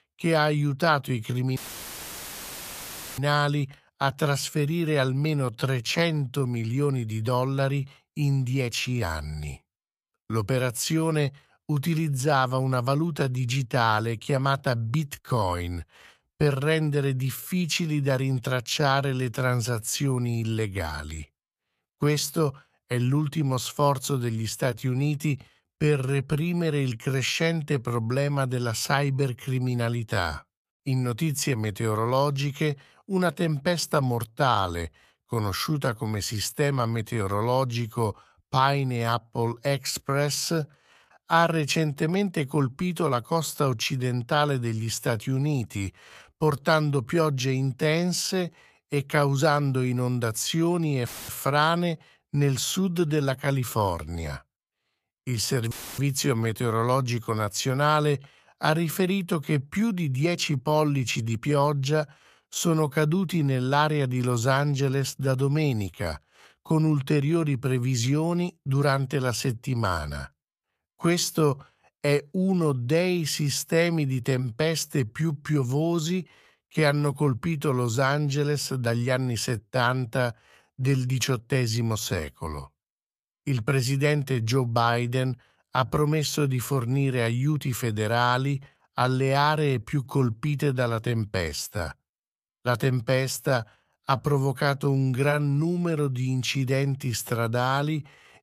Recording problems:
audio cutting out; filled with static; at 1.5 s for 1.5 s, at 51 s and at 56 s

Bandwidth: 14.5 kHz